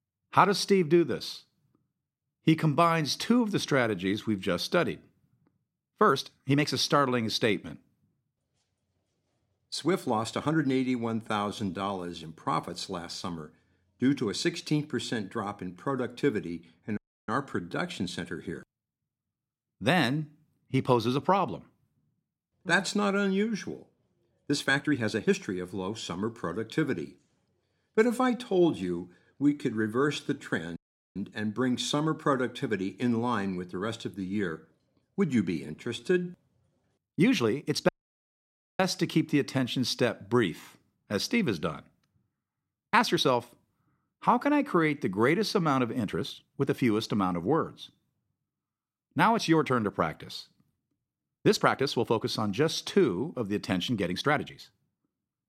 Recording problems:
uneven, jittery; strongly; from 6 to 55 s
audio cutting out; at 17 s, at 31 s and at 38 s for 1 s

